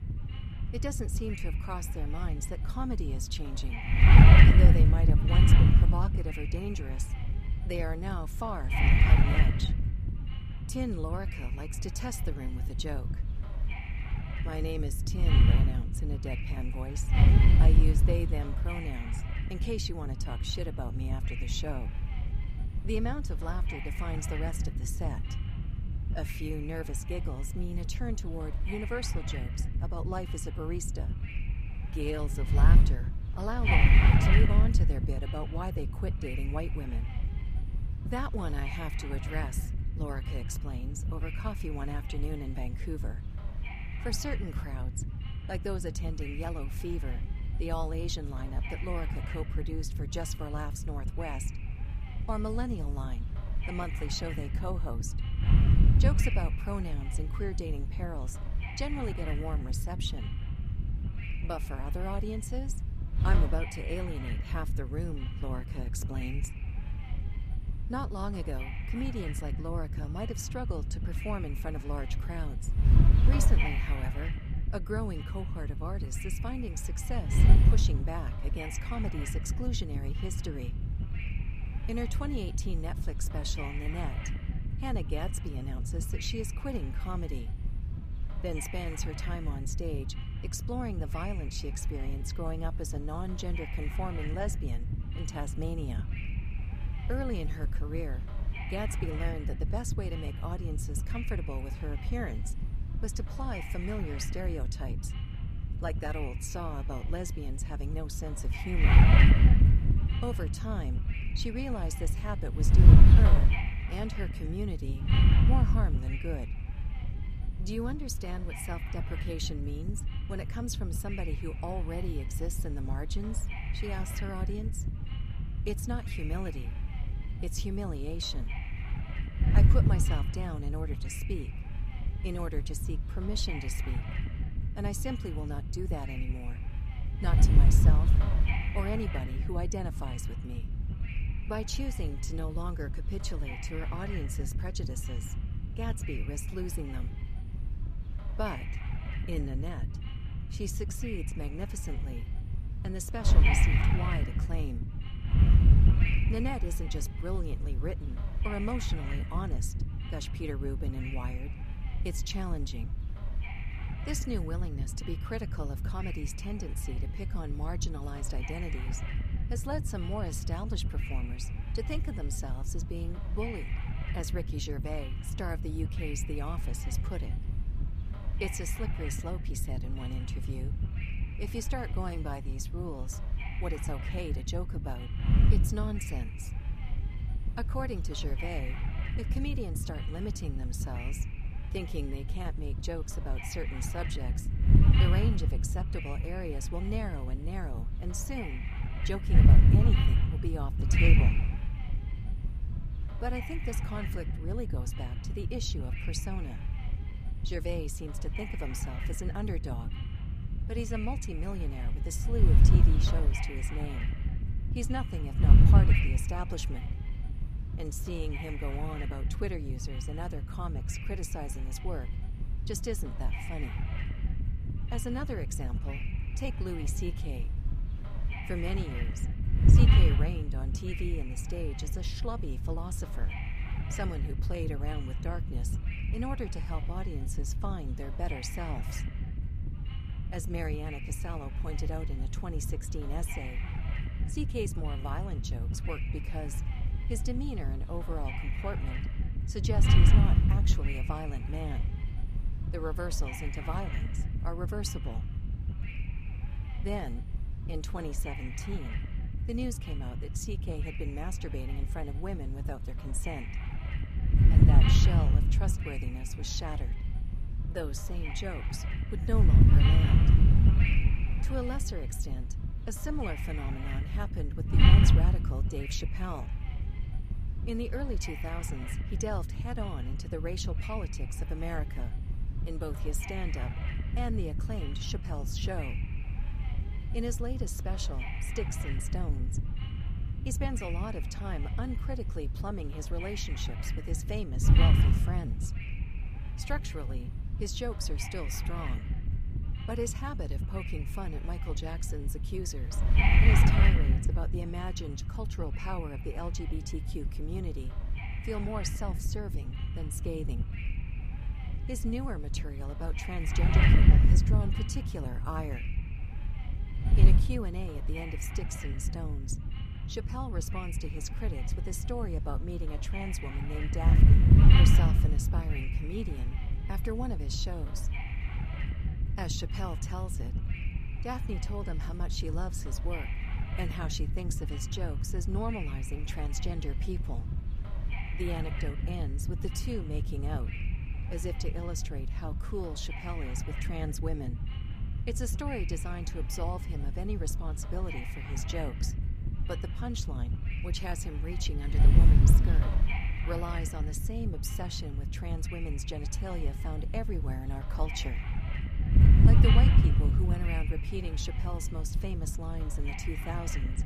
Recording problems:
wind noise on the microphone; heavy; 1 dB below the speech

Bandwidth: 14.5 kHz